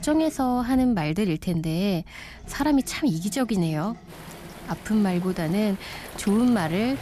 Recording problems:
rain or running water; noticeable; throughout; 20 dB below the speech
household noises; faint; throughout; 20 dB below the speech

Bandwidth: 14.5 kHz